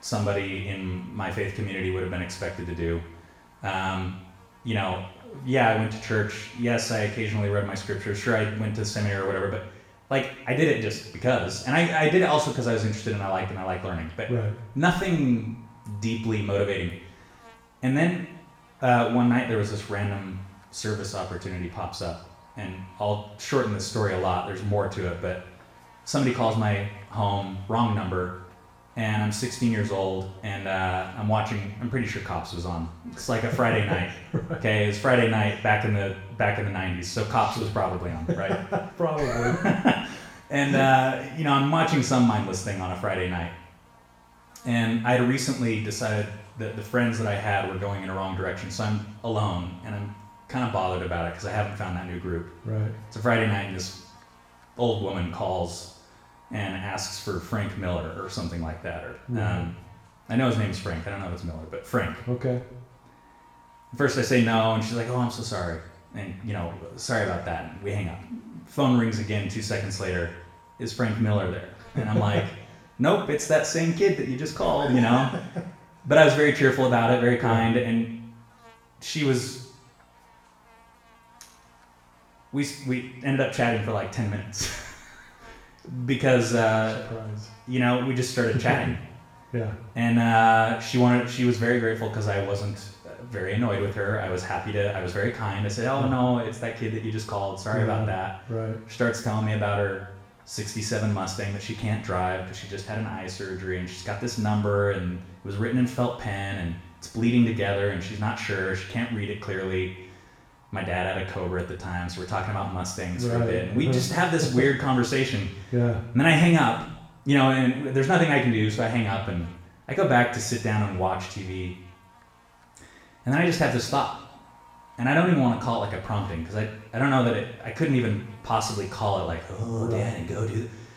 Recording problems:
off-mic speech; far
room echo; noticeable; dies away in 0.7 s
electrical hum; faint; throughout; 60 Hz, 25 dB below the speech

